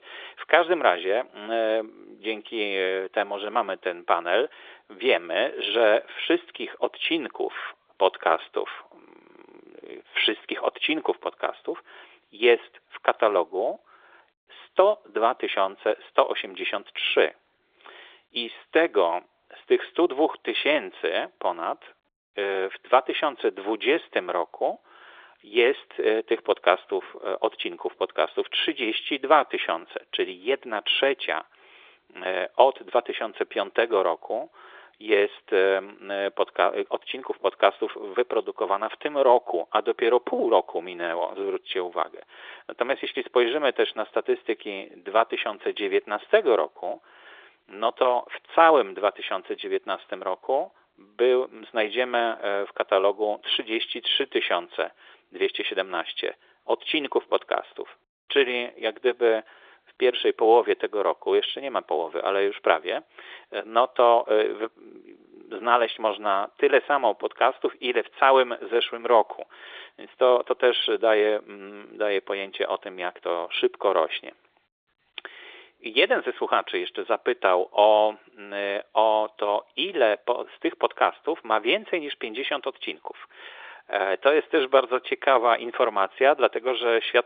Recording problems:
phone-call audio; nothing above 3.5 kHz

